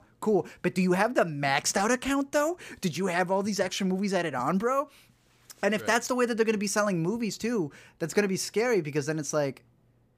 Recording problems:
none

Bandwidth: 15 kHz